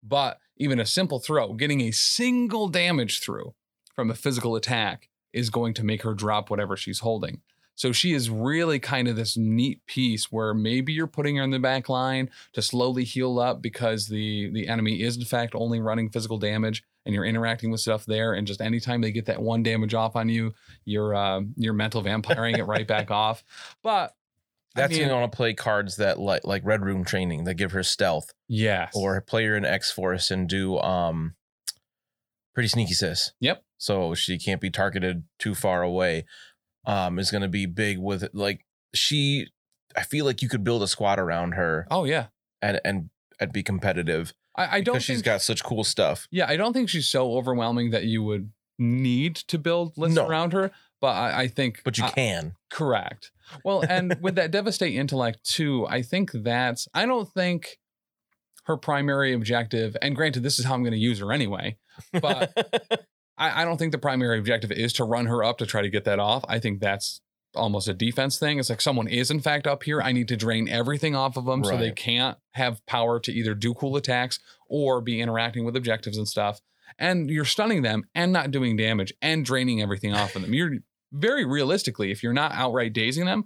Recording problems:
none

